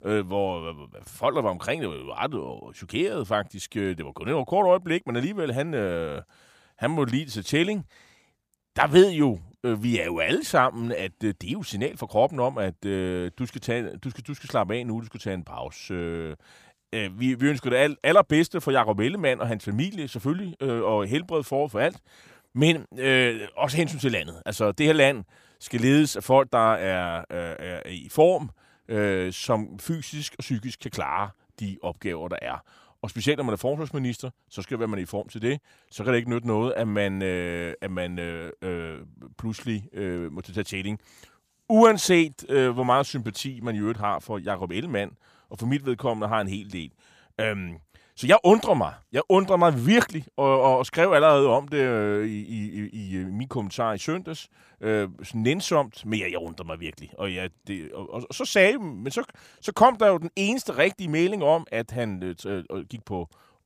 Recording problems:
none

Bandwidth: 15 kHz